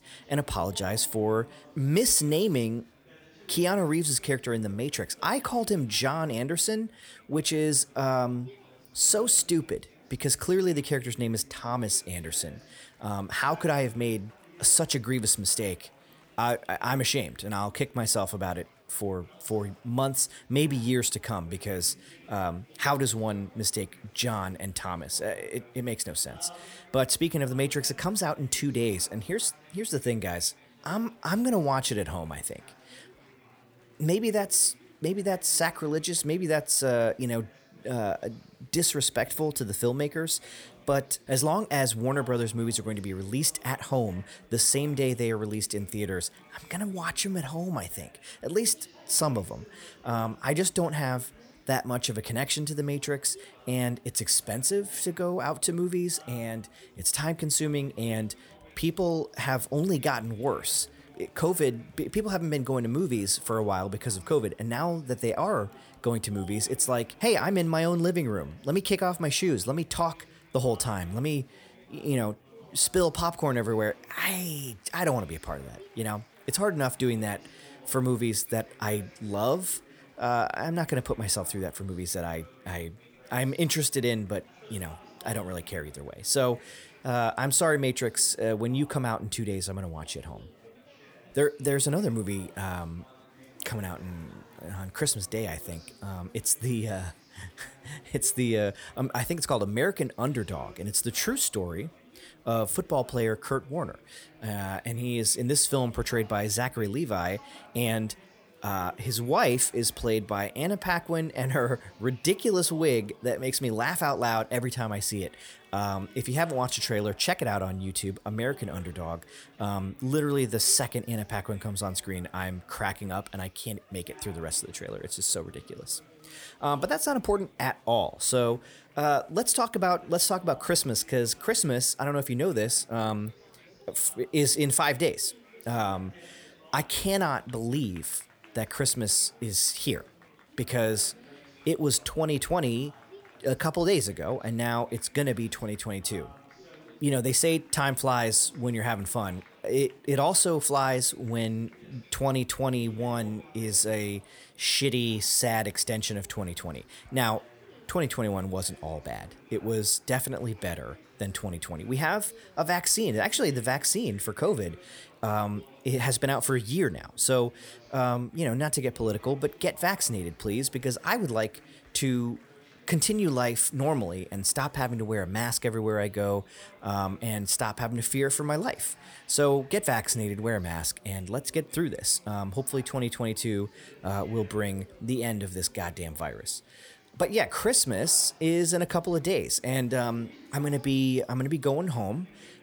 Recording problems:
chatter from many people; faint; throughout; 25 dB below the speech

